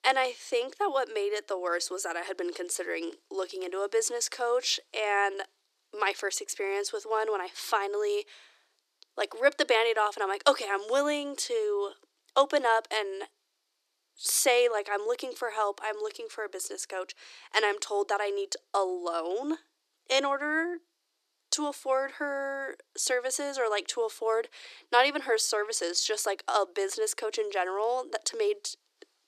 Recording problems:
thin; somewhat; fading below 300 Hz

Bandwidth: 14 kHz